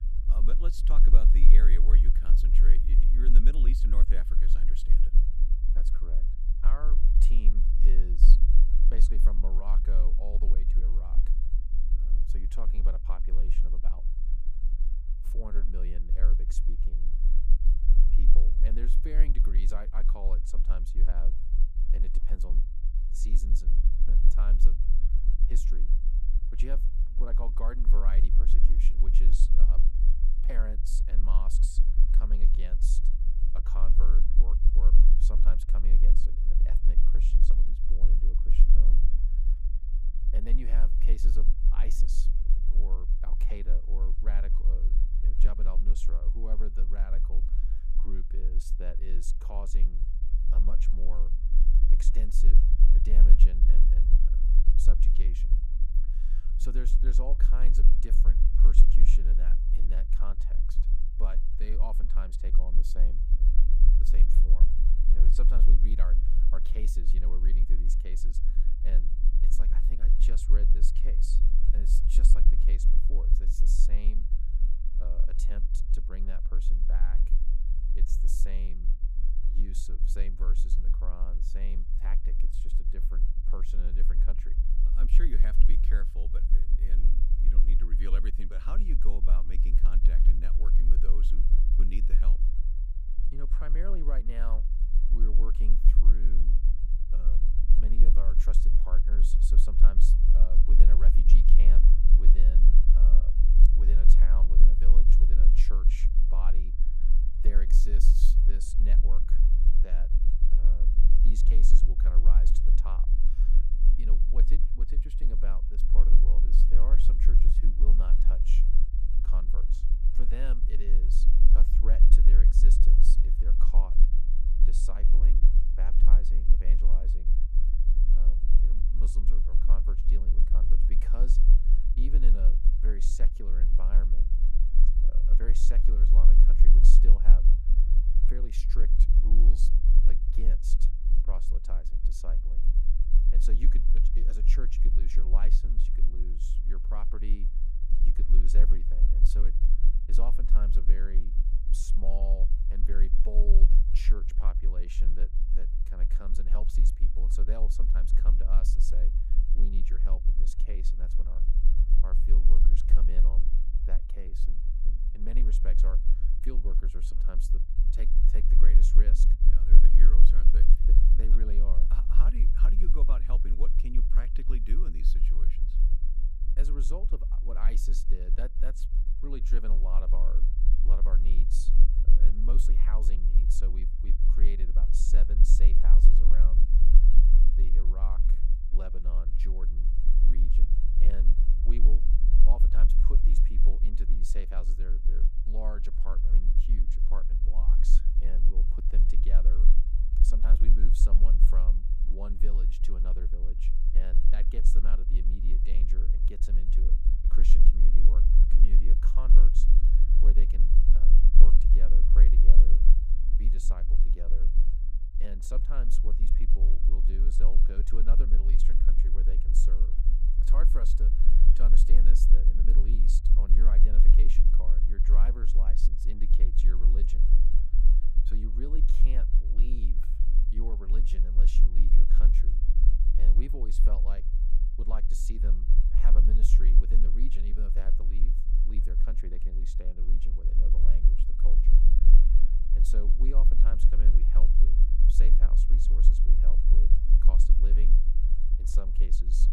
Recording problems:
low rumble; loud; throughout; 5 dB below the speech

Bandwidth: 15 kHz